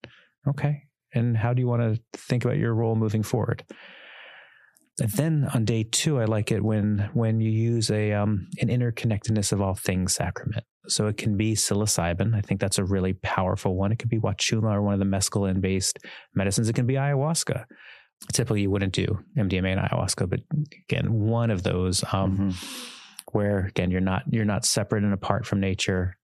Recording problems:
squashed, flat; somewhat

